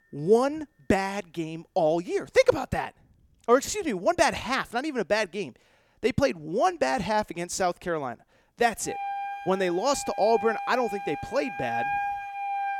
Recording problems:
background music; loud; throughout; 7 dB below the speech

